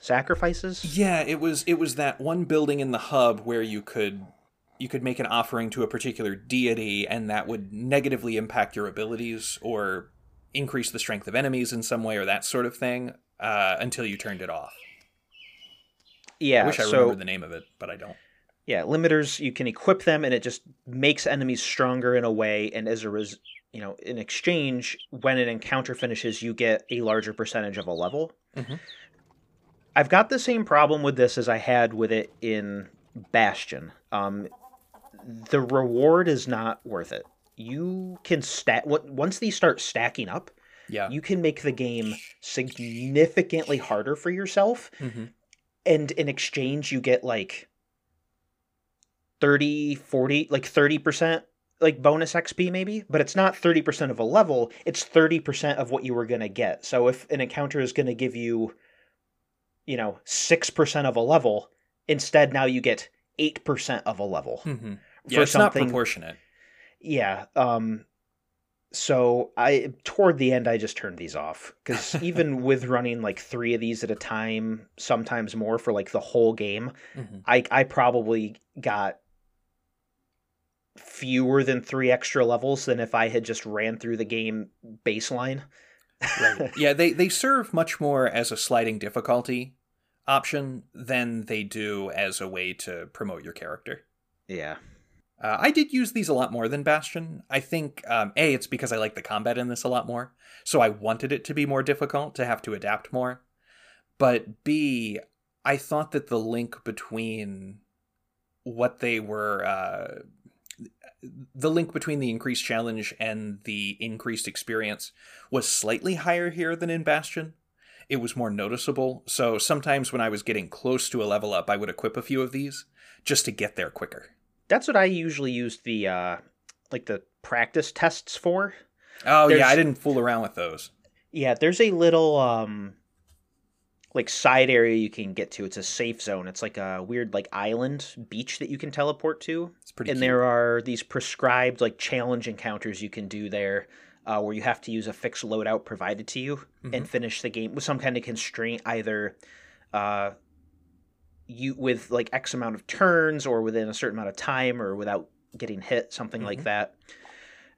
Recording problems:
animal sounds; faint; until 48 s; 25 dB below the speech

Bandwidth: 15 kHz